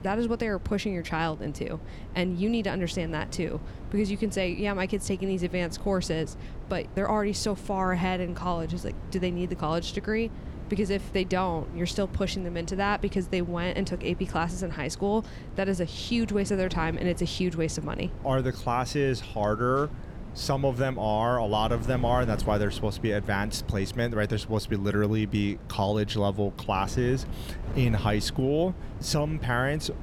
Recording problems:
wind noise on the microphone; occasional gusts; 15 dB below the speech

